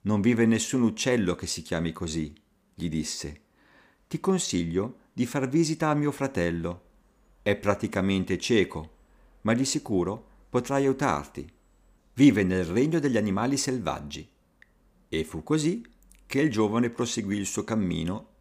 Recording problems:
none

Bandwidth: 15 kHz